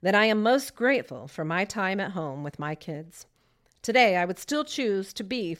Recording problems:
none

